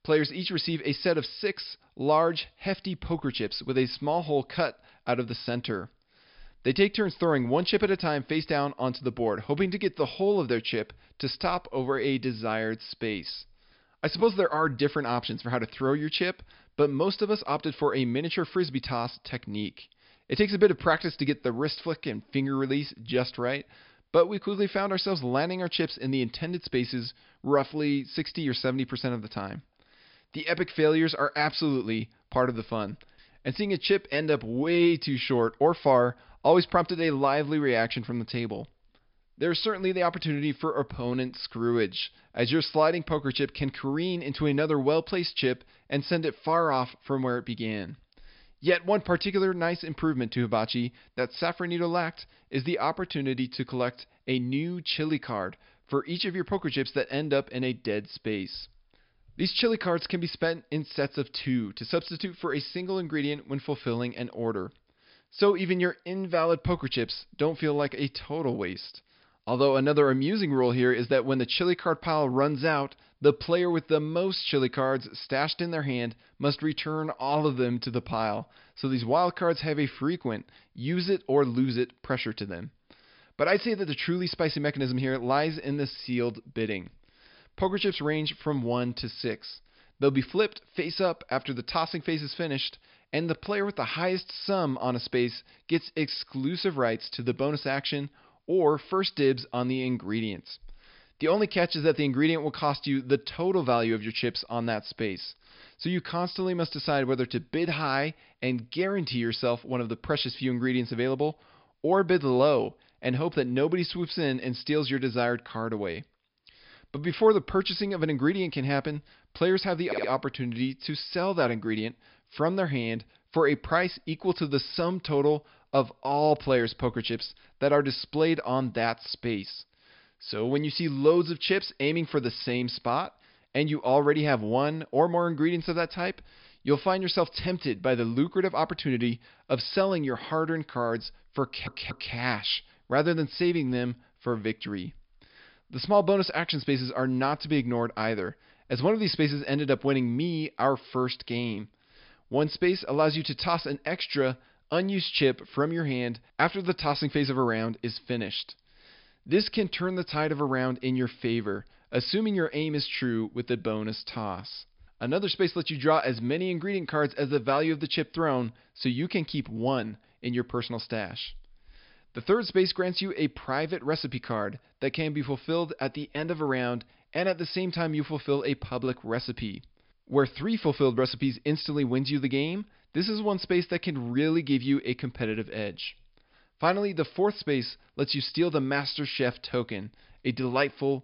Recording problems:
high frequencies cut off; noticeable; nothing above 5.5 kHz
audio stuttering; at 2:00 and at 2:21

